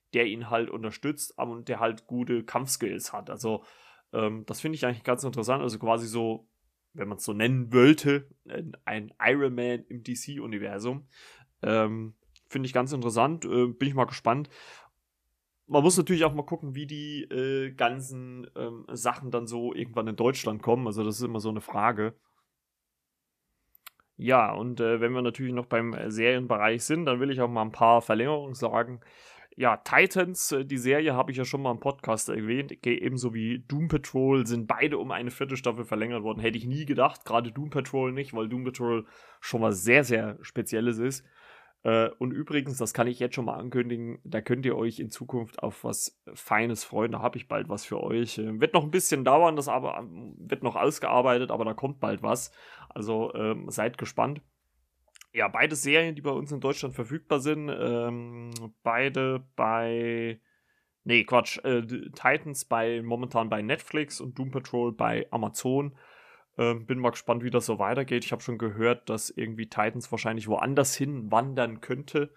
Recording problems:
none

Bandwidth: 14.5 kHz